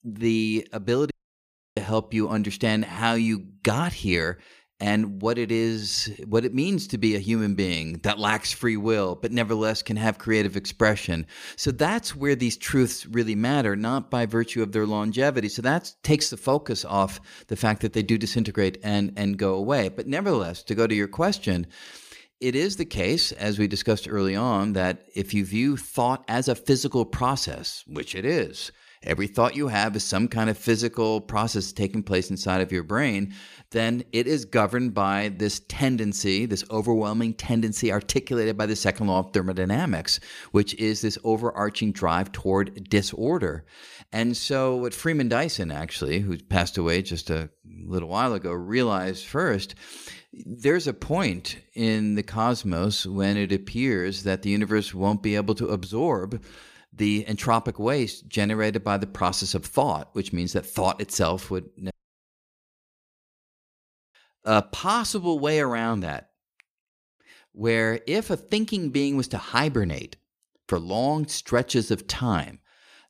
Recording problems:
audio cutting out; at 1 s for 0.5 s and at 1:02 for 2 s

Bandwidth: 15 kHz